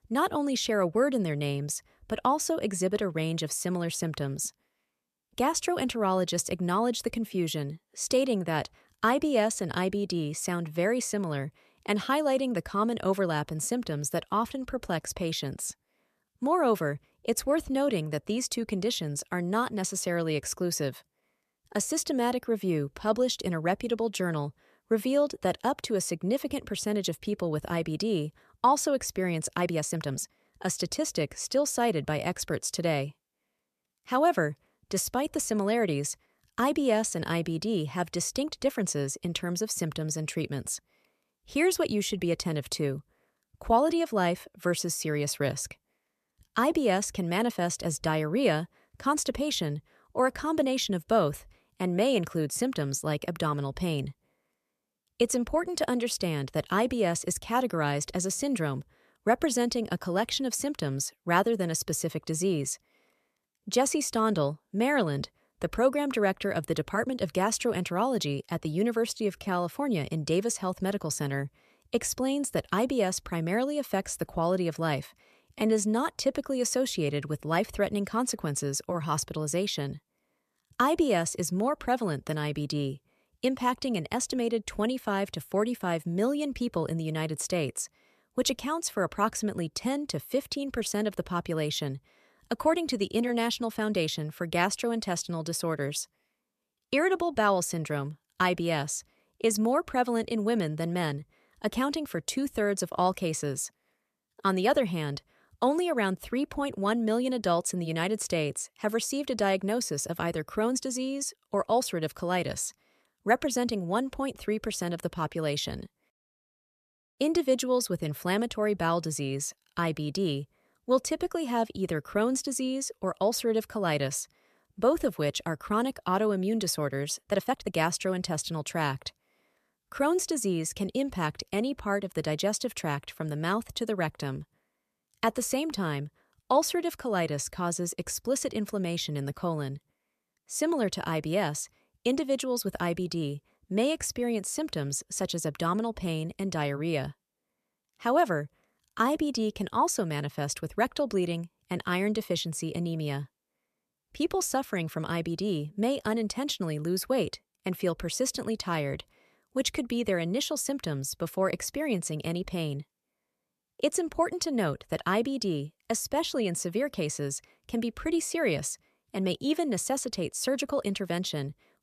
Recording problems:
uneven, jittery; strongly; from 30 s to 2:29

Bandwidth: 14.5 kHz